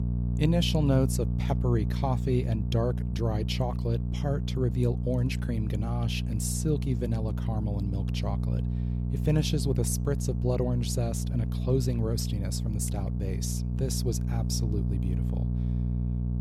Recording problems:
electrical hum; loud; throughout; 60 Hz, 8 dB below the speech

